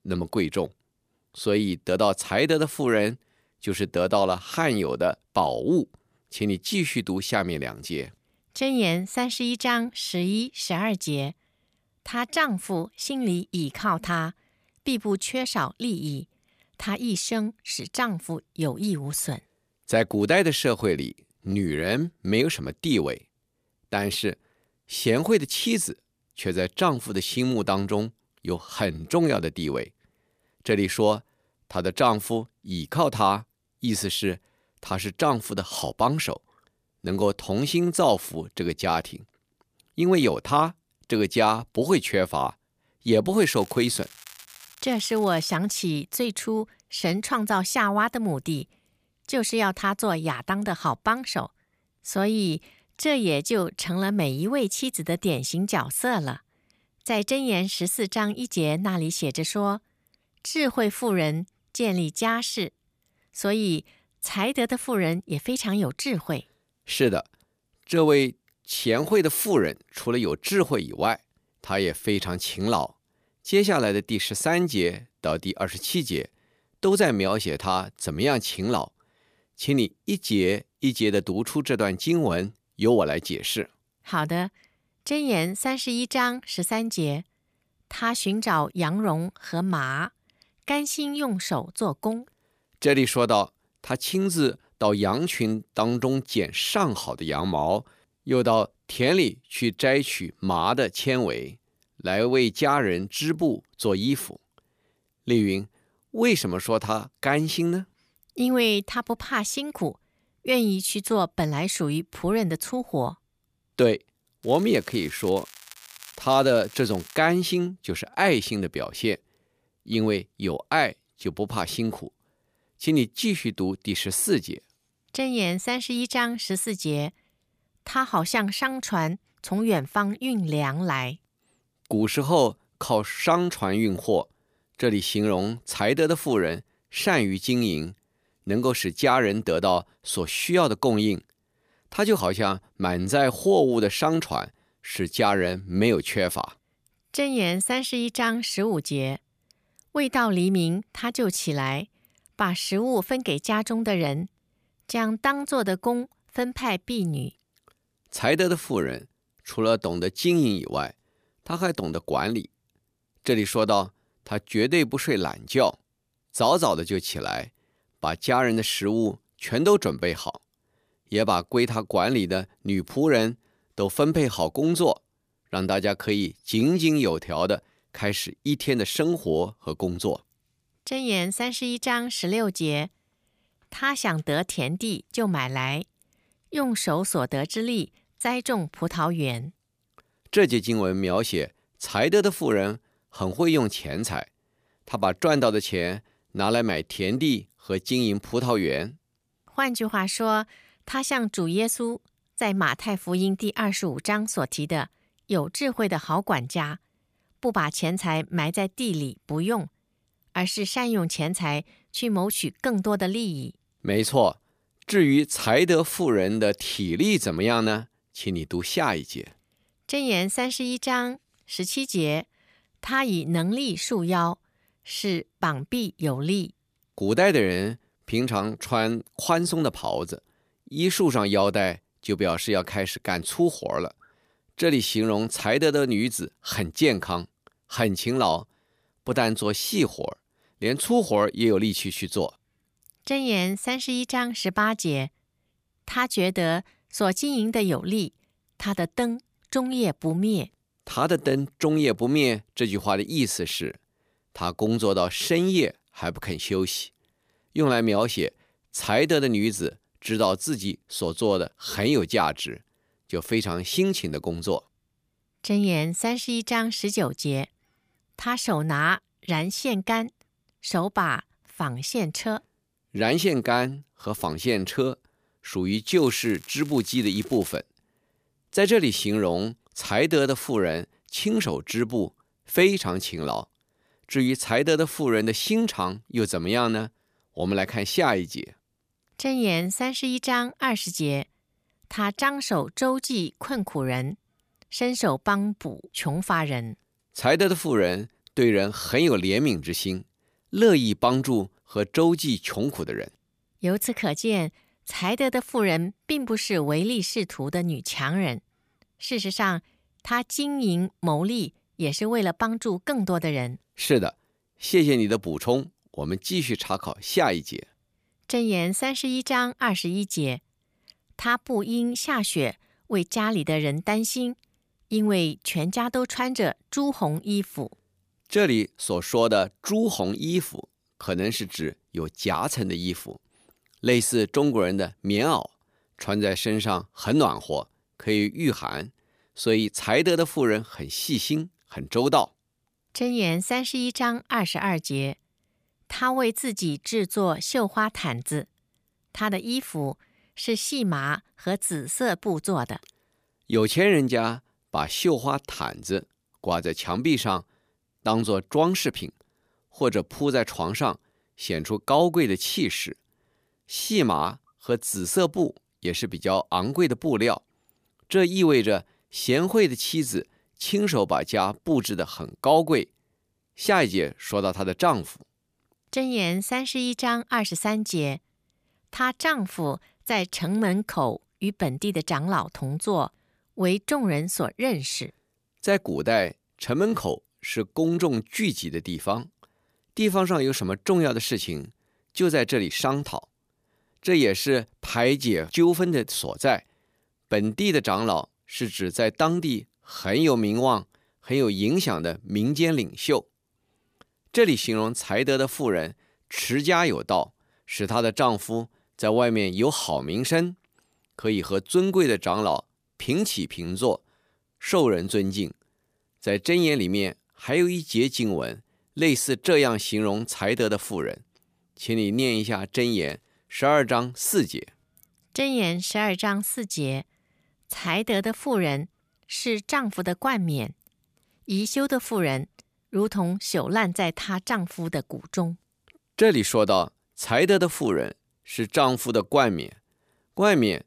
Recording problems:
crackling; noticeable; from 43 to 46 s, from 1:54 to 1:57 and from 4:36 to 4:38; 20 dB below the speech

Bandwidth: 15 kHz